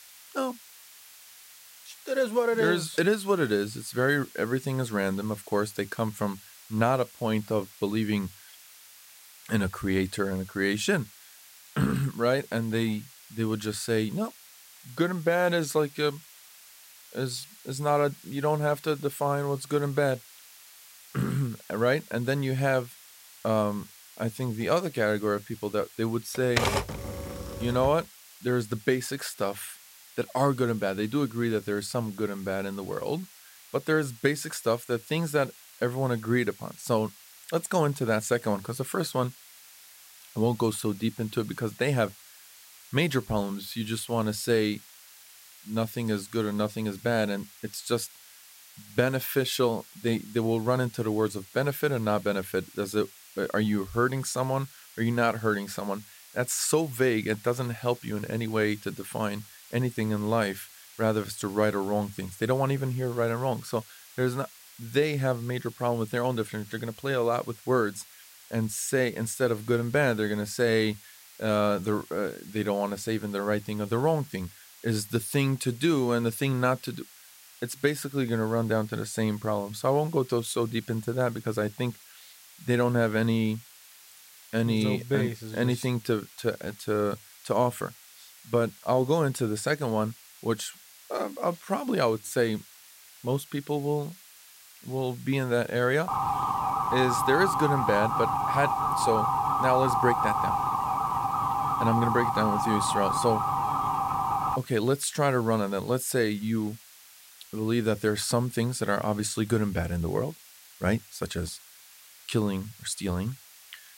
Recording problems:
hiss; faint; throughout; 20 dB below the speech
keyboard typing; loud; from 26 to 28 s; peak 2 dB above the speech
siren; loud; from 1:36 to 1:45; peak 3 dB above the speech

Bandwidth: 16 kHz